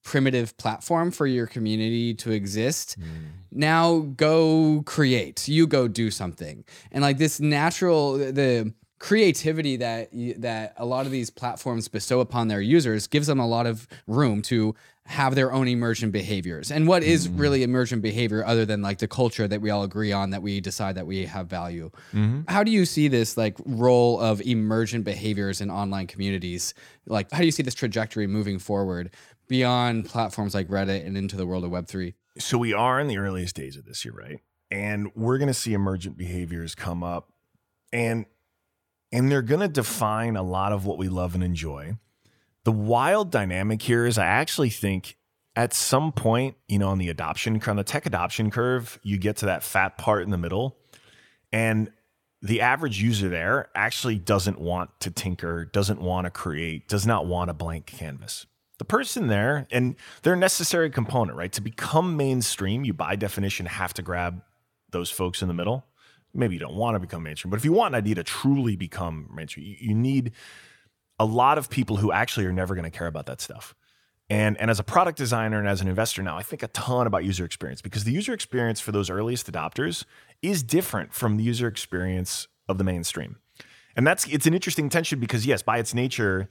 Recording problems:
uneven, jittery; strongly; from 1.5 s to 1:26

